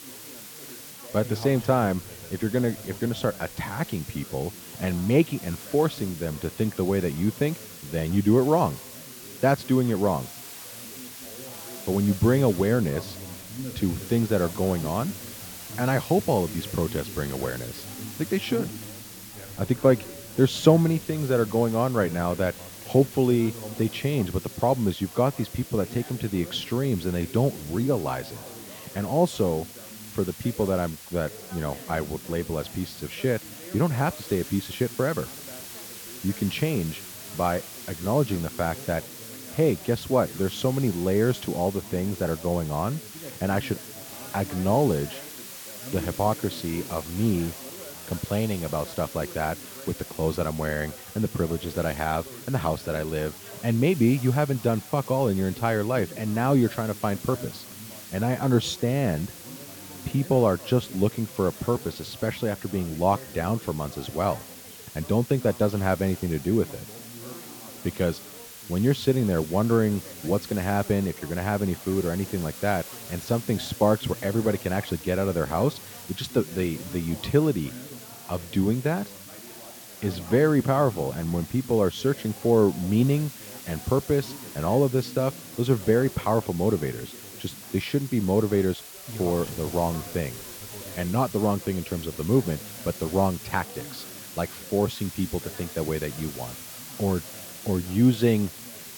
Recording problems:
muffled; slightly; fading above 1.5 kHz
background chatter; noticeable; throughout; 4 voices, 20 dB below the speech
hiss; noticeable; throughout; 15 dB below the speech

